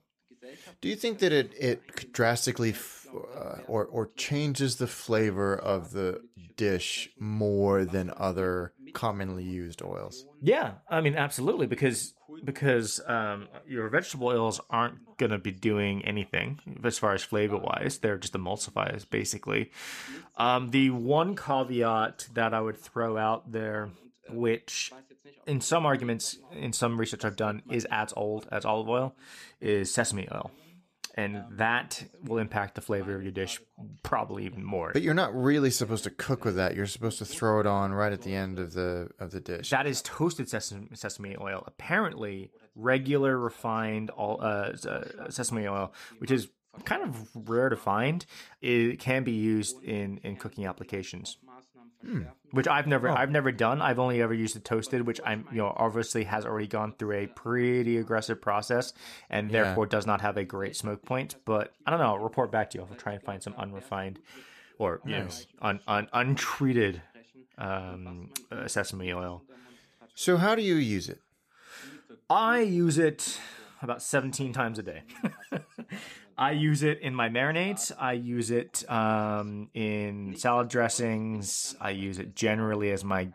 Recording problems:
voice in the background; faint; throughout; 25 dB below the speech

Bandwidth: 14.5 kHz